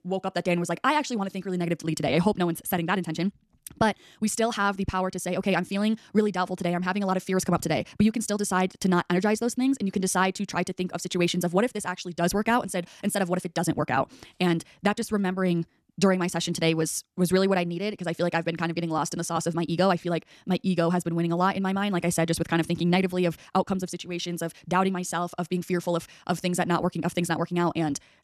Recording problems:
wrong speed, natural pitch; too fast; 1.6 times normal speed

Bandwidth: 13.5 kHz